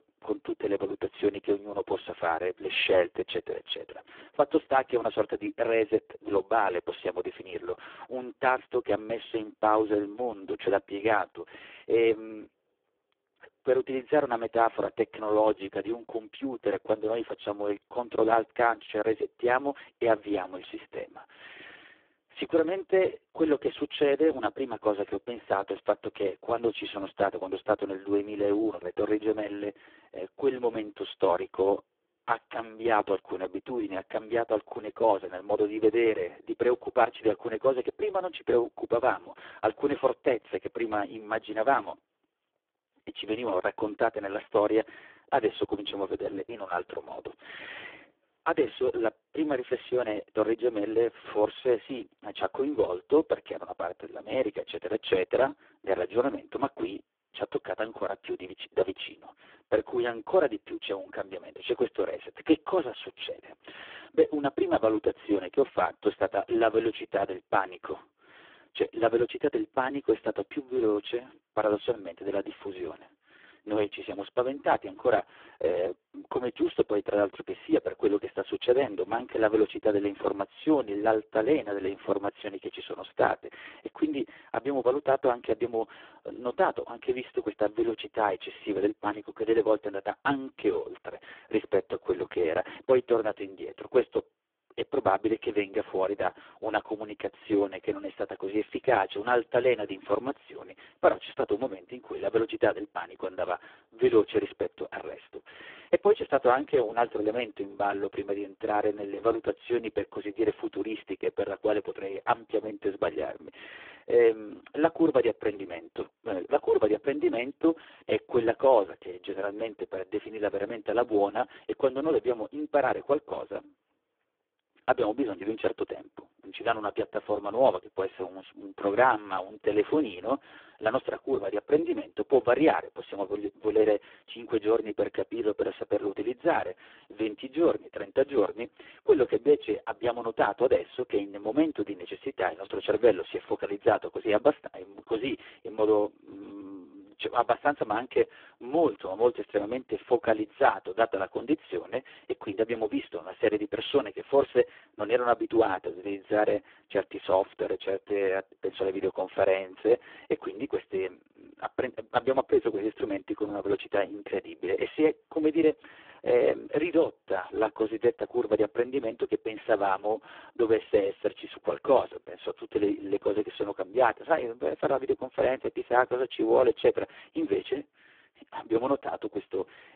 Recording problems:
phone-call audio; poor line

